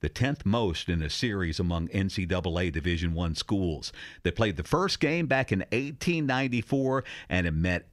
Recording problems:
none

